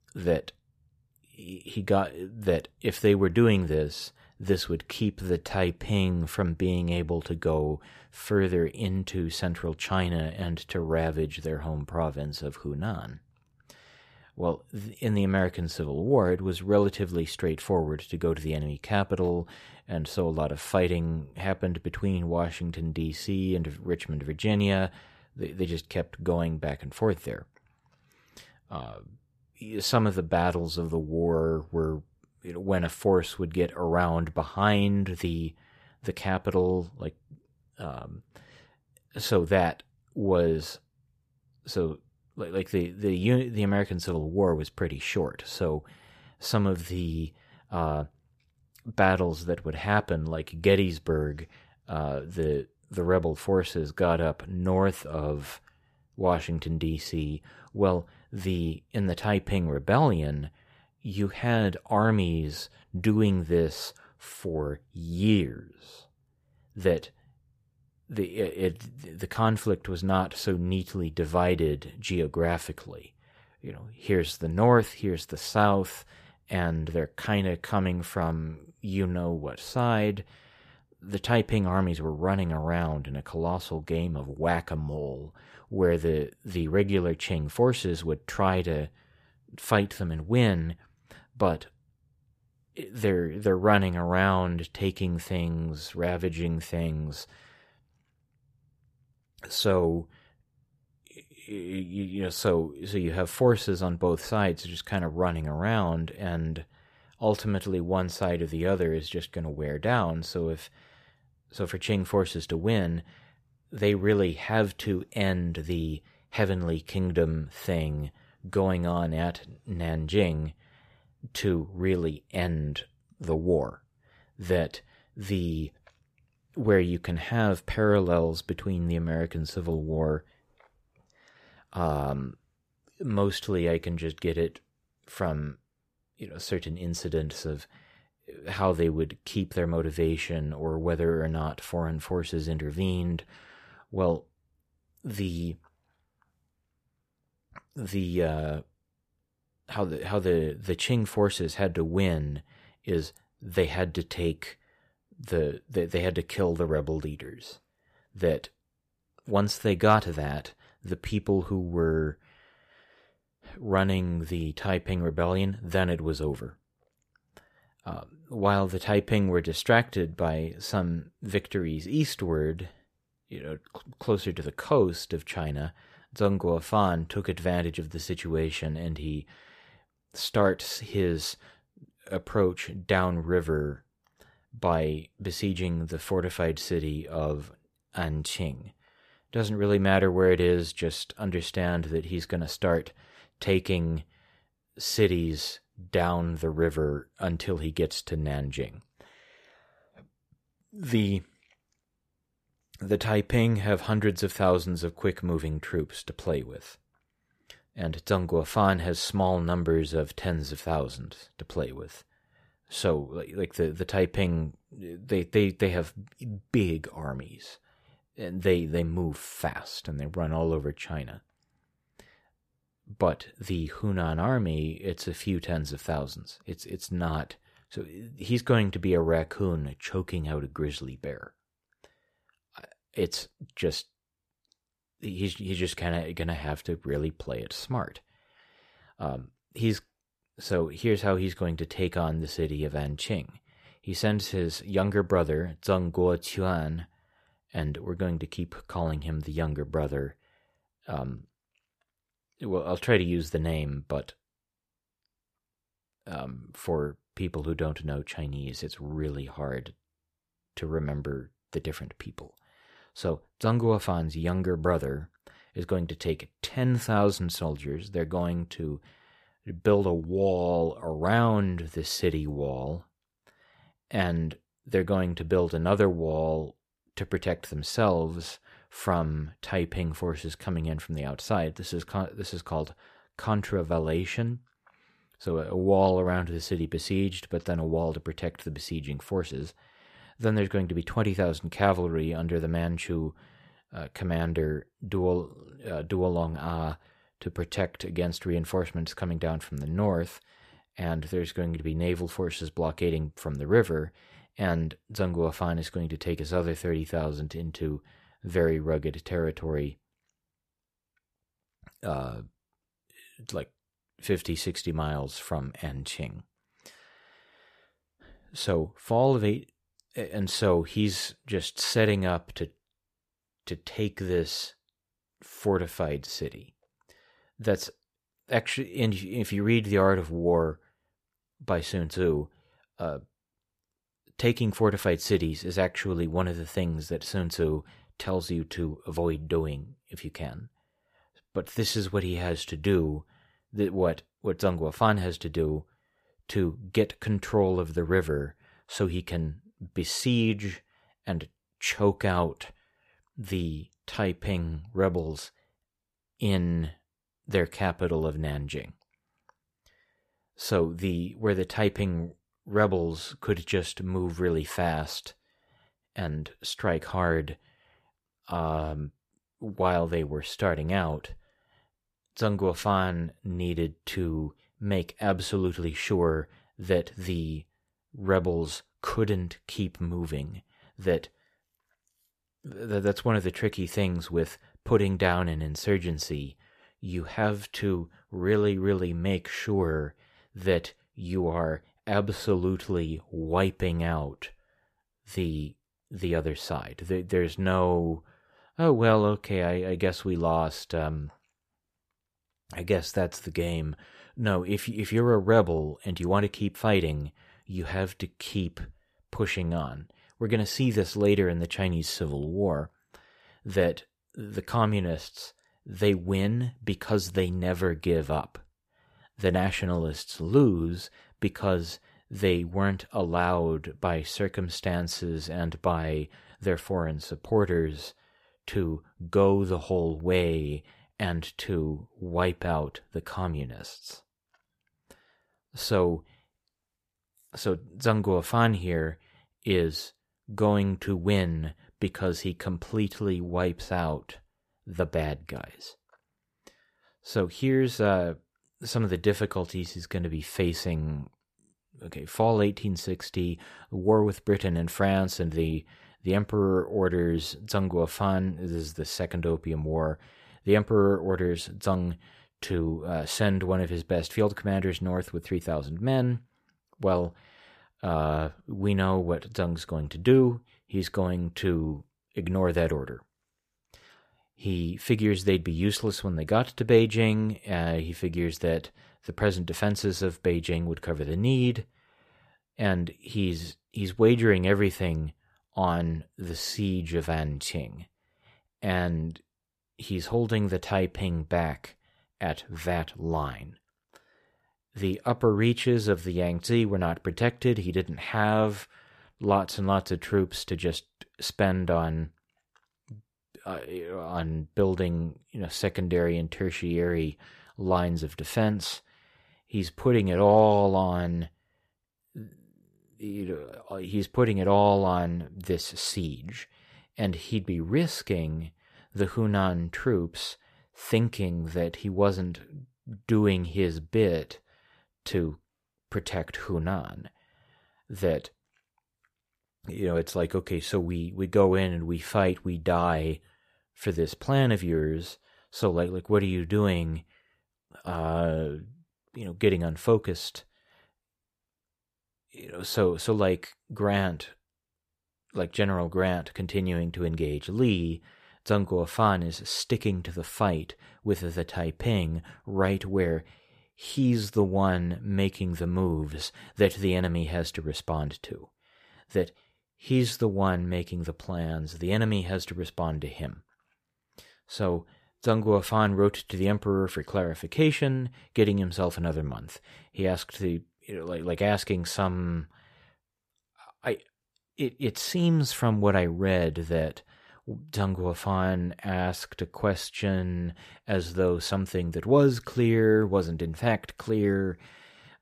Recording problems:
none

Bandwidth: 14.5 kHz